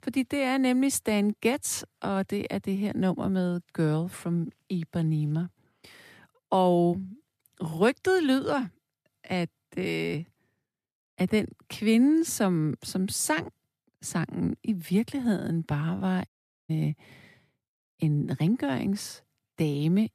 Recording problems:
audio cutting out; at 16 s

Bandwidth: 14.5 kHz